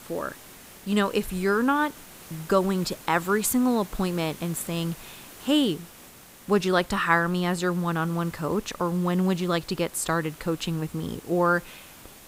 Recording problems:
hiss; noticeable; throughout; 20 dB below the speech

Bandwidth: 15.5 kHz